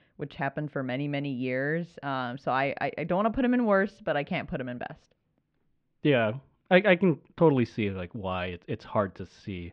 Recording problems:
muffled; very; fading above 2.5 kHz

